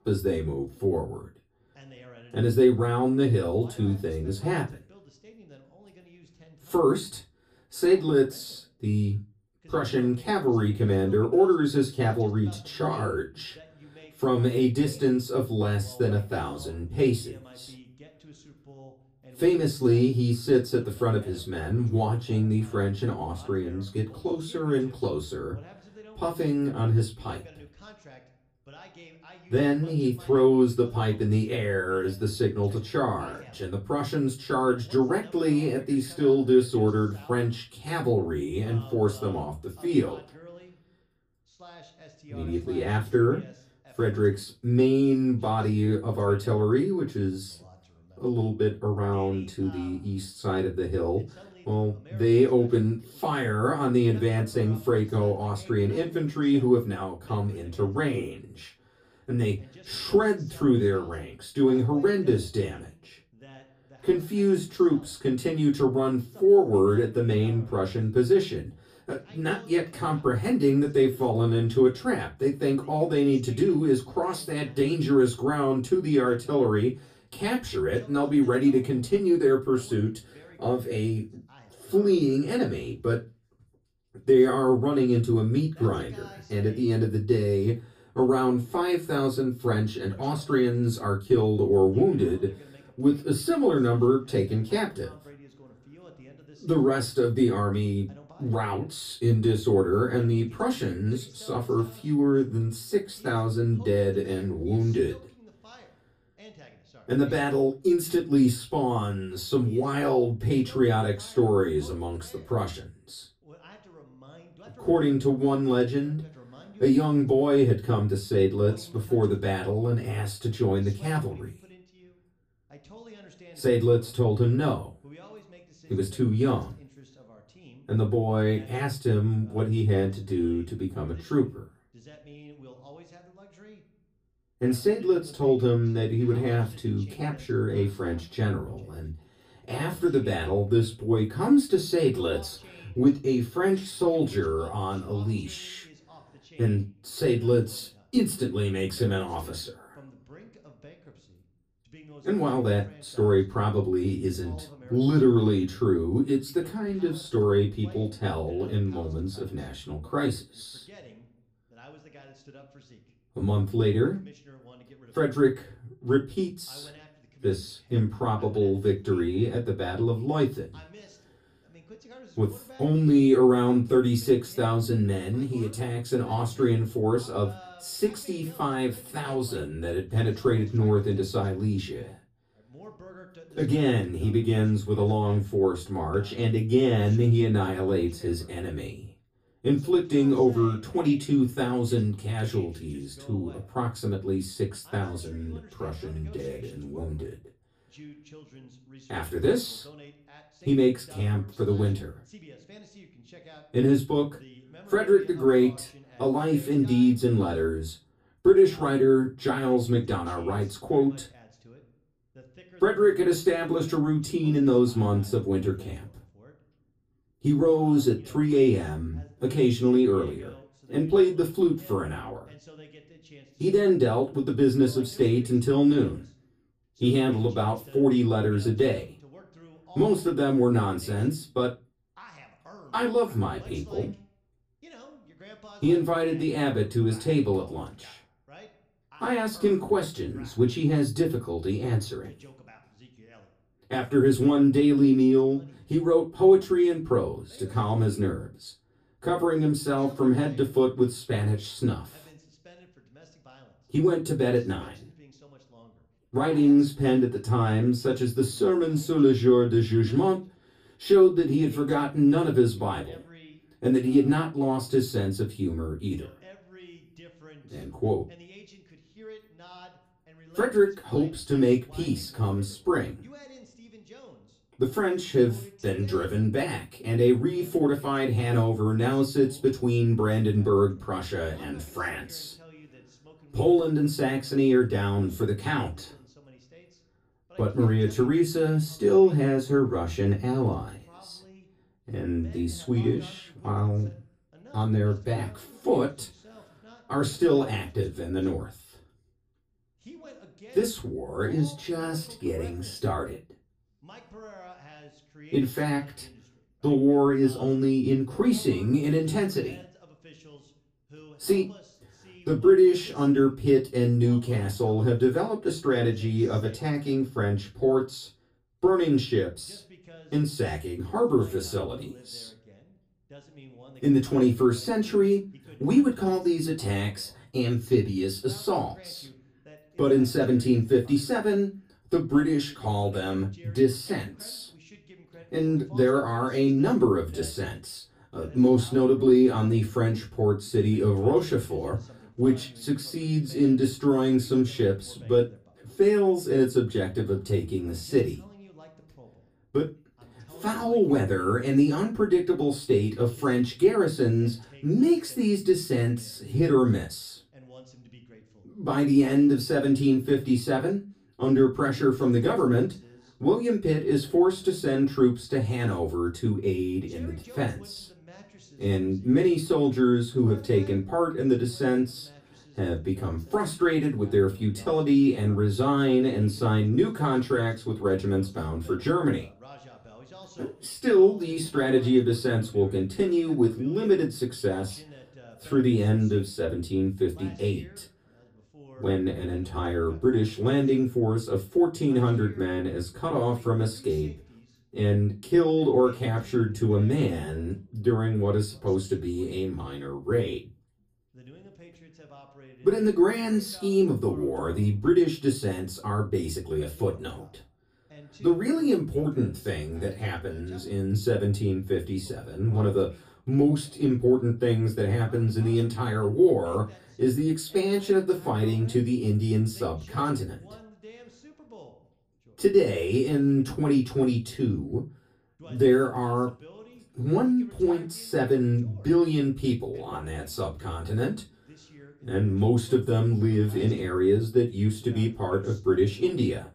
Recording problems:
off-mic speech; far
room echo; very slight; dies away in 0.2 s
voice in the background; faint; throughout; 25 dB below the speech

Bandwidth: 15 kHz